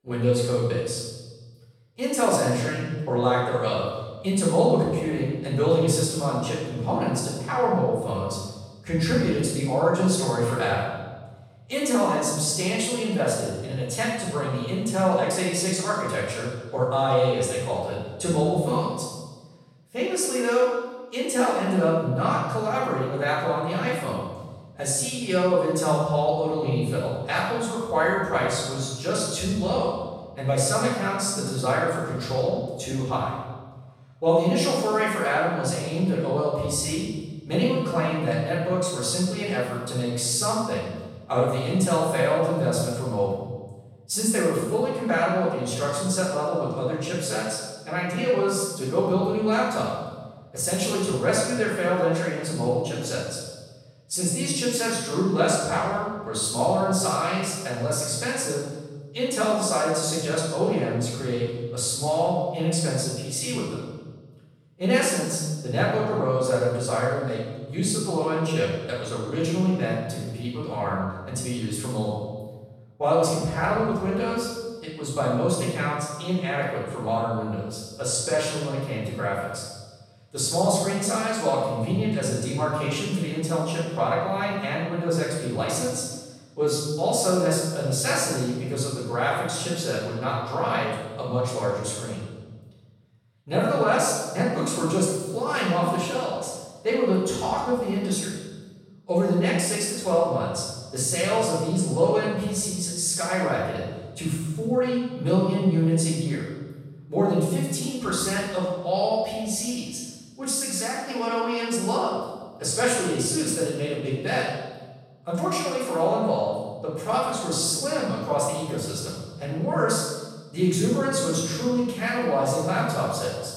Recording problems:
room echo; strong; dies away in 1.1 s
off-mic speech; far

